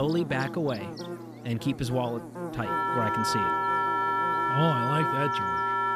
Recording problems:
background music; very loud; throughout; 4 dB above the speech
electrical hum; loud; throughout; 60 Hz, 8 dB below the speech
abrupt cut into speech; at the start

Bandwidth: 14.5 kHz